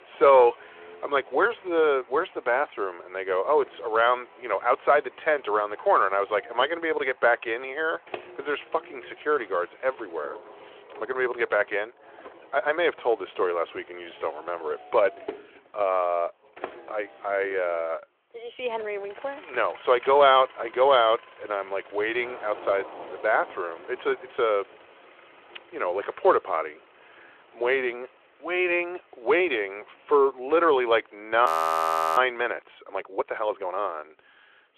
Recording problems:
thin; very; fading below 350 Hz
phone-call audio; nothing above 15 kHz
rain or running water; faint; throughout; 25 dB below the speech
traffic noise; faint; throughout; 25 dB below the speech
audio freezing; at 31 s for 0.5 s

